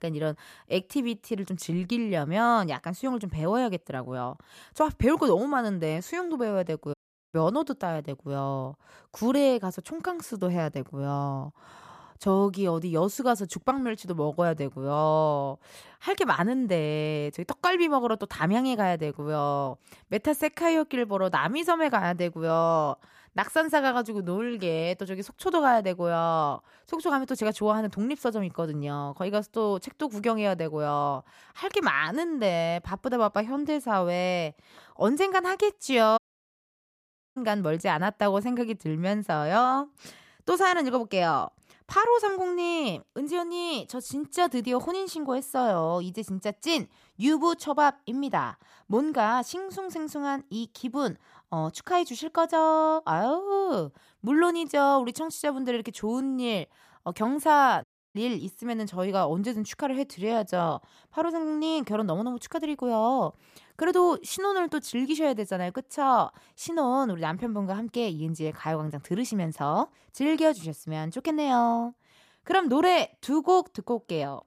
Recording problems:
audio cutting out; at 7 s, at 36 s for 1 s and at 58 s

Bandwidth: 14.5 kHz